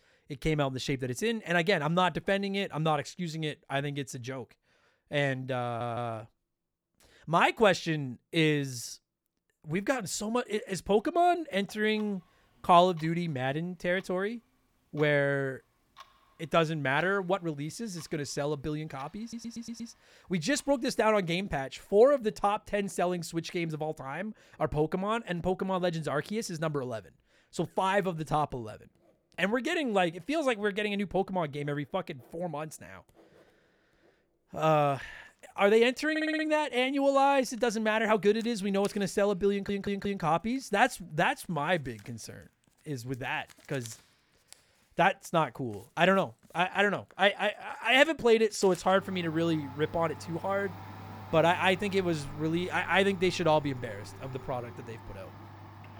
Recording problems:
household noises; faint; from 11 s on; 20 dB below the speech
audio stuttering; 4 times, first at 5.5 s

